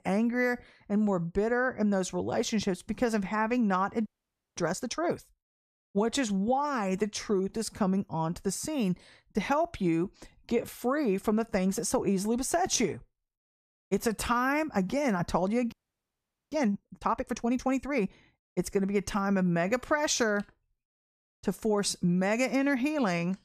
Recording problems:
audio freezing; at 4 s for 0.5 s and at 16 s for 1 s

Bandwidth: 14.5 kHz